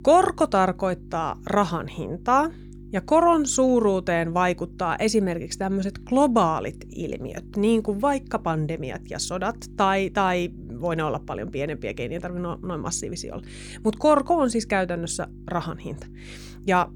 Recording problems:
electrical hum; faint; throughout; 50 Hz, 25 dB below the speech

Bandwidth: 18 kHz